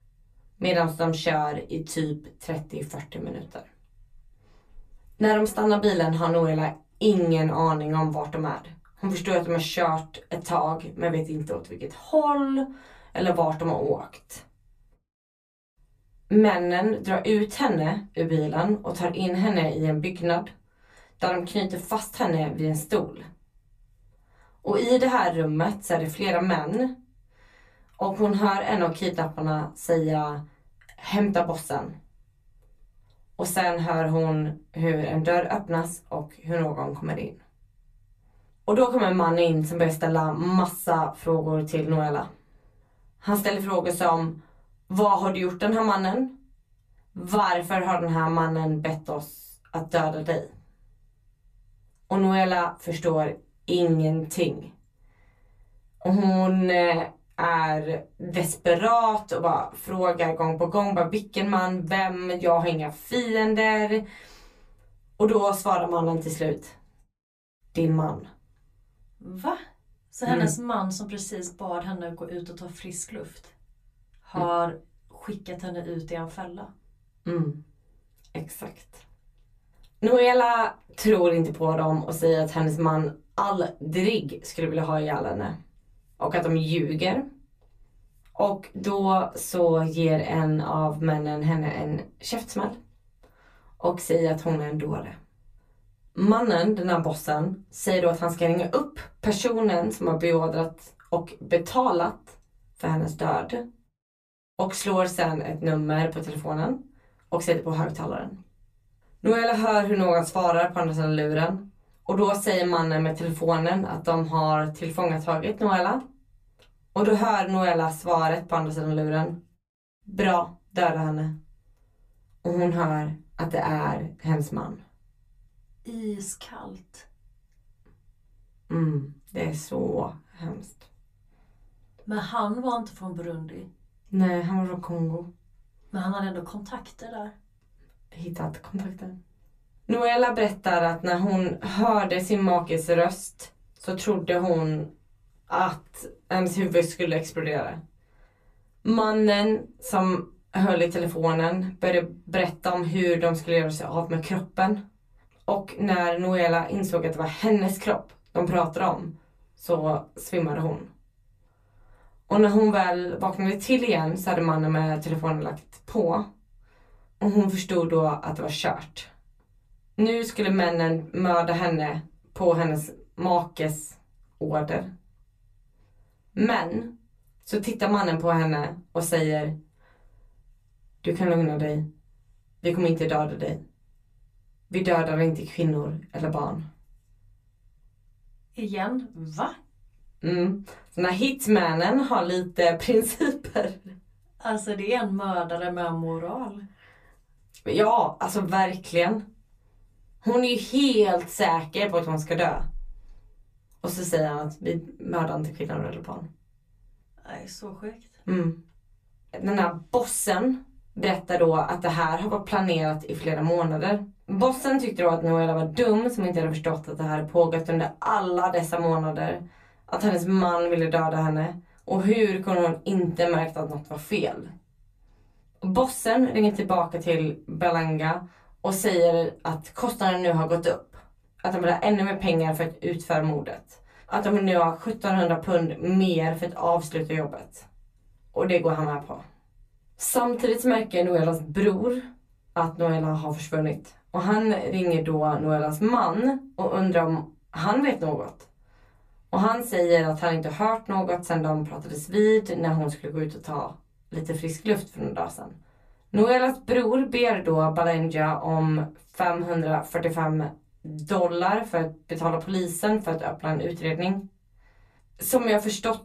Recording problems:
off-mic speech; far
room echo; very slight; dies away in 0.2 s

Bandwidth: 14.5 kHz